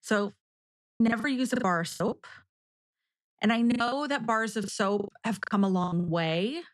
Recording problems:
choppy; very; 18% of the speech affected

